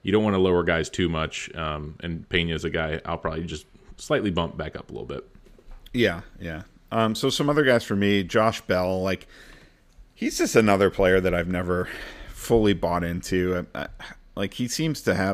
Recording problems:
abrupt cut into speech; at the end

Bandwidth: 15 kHz